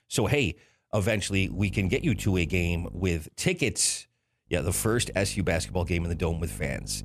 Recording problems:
electrical hum; faint; from 1.5 to 3 s and from 4.5 s on; 50 Hz, 25 dB below the speech

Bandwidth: 14.5 kHz